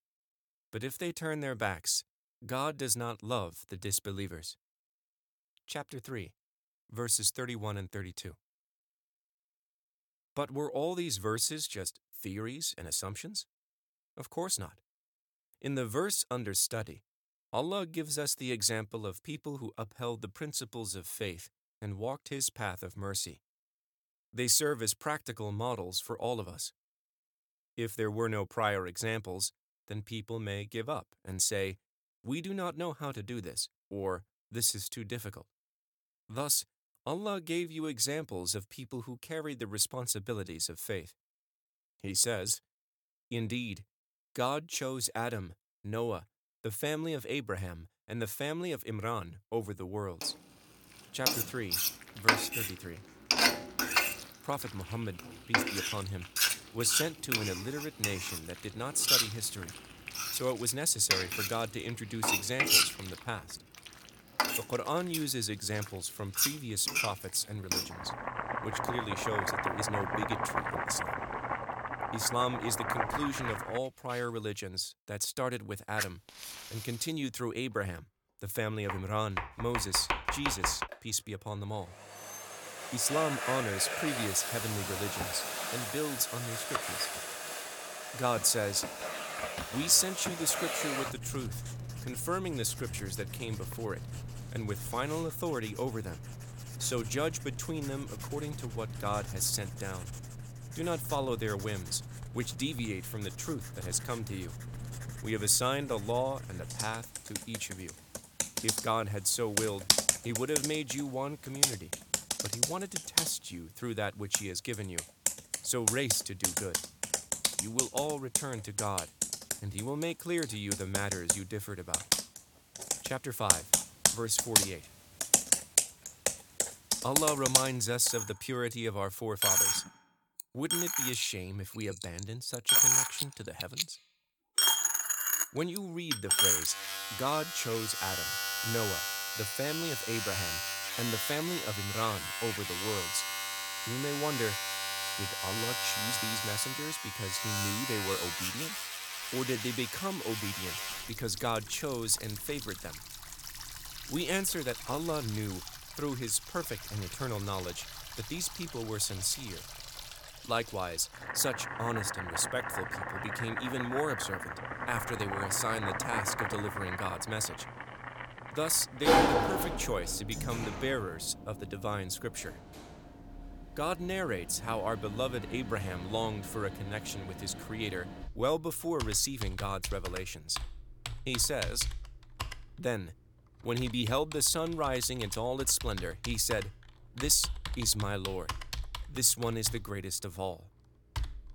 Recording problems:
household noises; very loud; from 51 s on; 1 dB above the speech

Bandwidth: 18 kHz